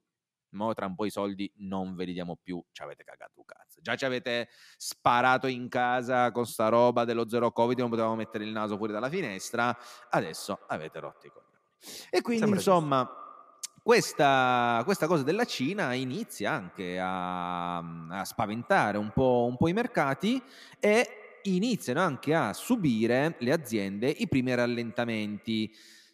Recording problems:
echo of what is said; faint; from 7.5 s on; 120 ms later, 20 dB below the speech

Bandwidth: 14.5 kHz